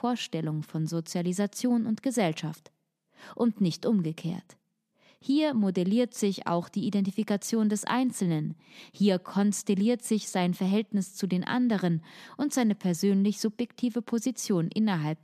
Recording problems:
none

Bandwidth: 14.5 kHz